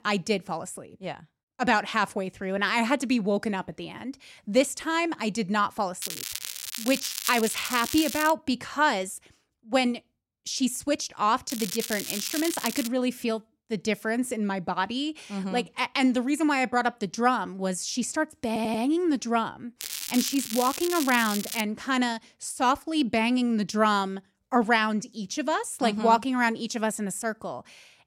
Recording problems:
crackling; loud; from 6 to 8.5 s, from 12 to 13 s and from 20 to 22 s; 6 dB below the speech
audio stuttering; at 18 s

